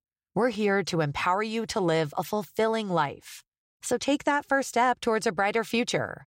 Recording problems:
none

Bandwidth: 16 kHz